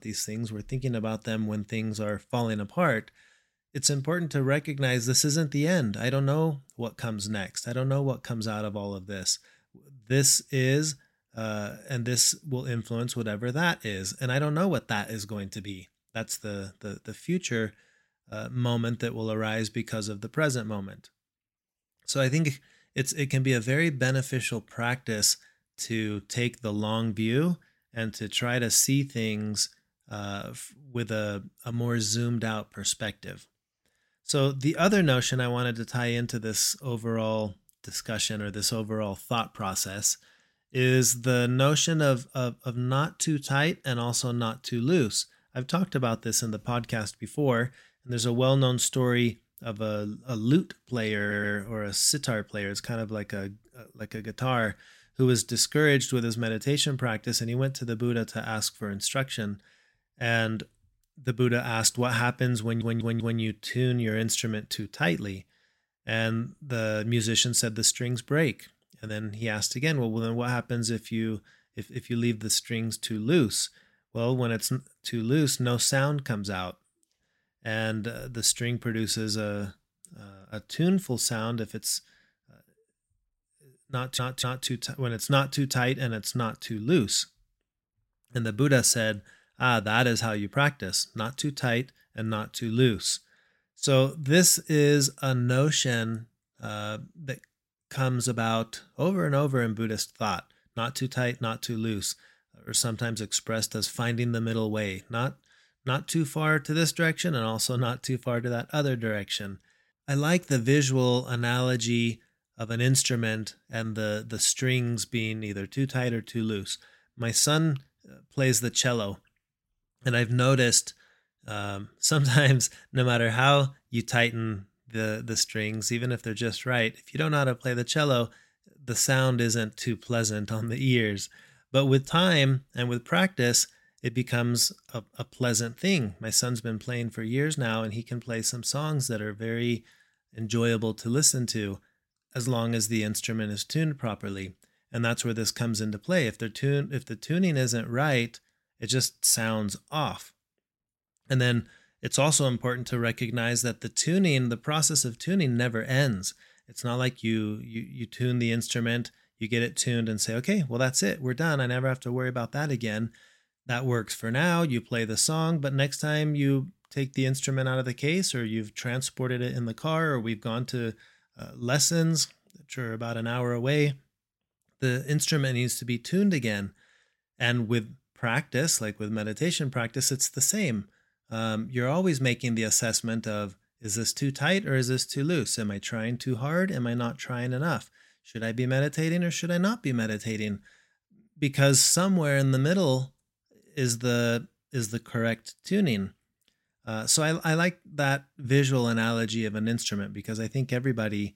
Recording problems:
audio stuttering; at 51 s, at 1:03 and at 1:24

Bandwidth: 16 kHz